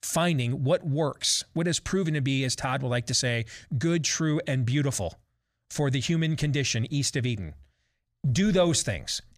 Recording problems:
none

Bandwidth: 15 kHz